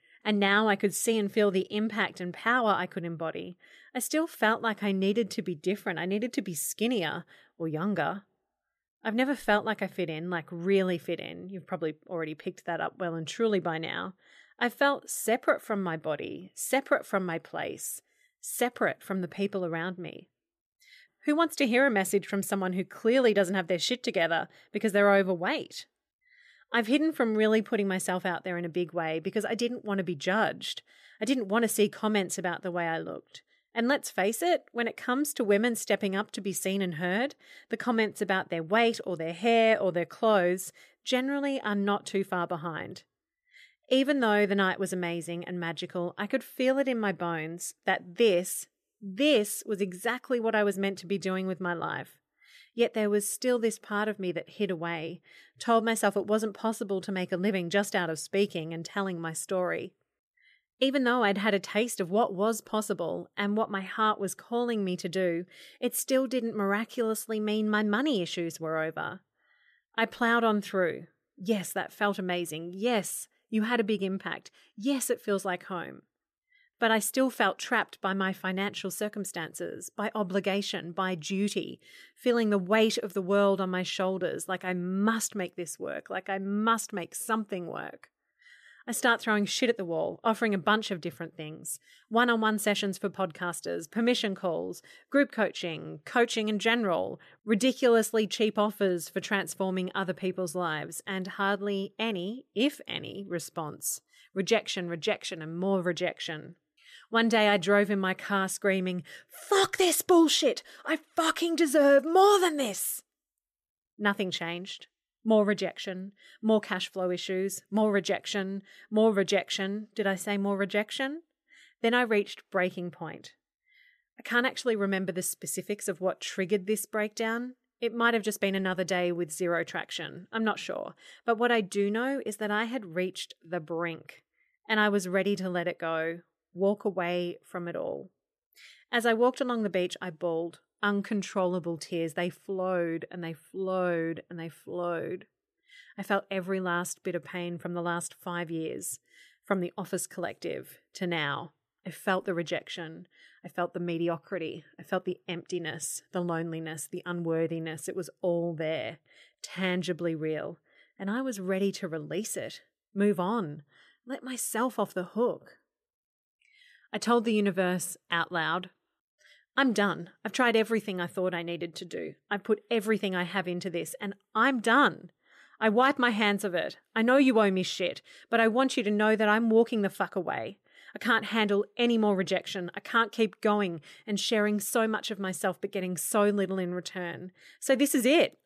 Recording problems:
none

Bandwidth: 14.5 kHz